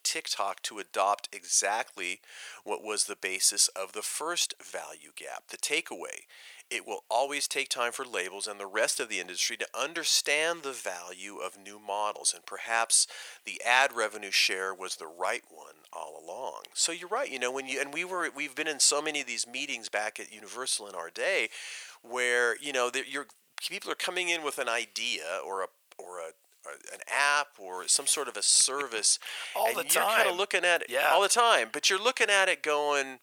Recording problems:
thin; very; fading below 550 Hz

